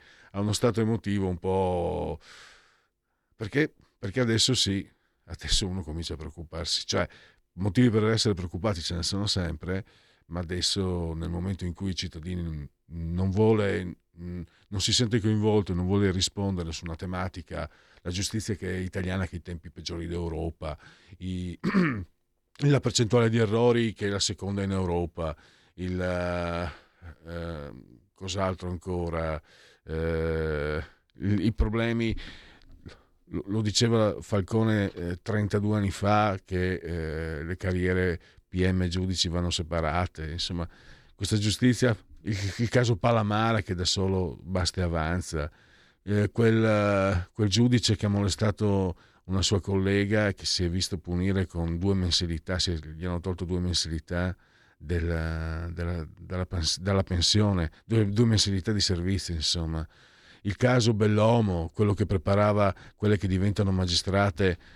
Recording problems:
none

